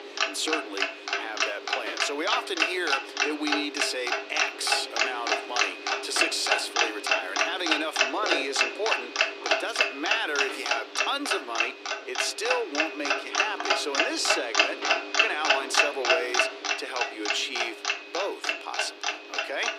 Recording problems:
thin; somewhat; fading below 300 Hz
household noises; very loud; throughout; 4 dB above the speech

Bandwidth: 15 kHz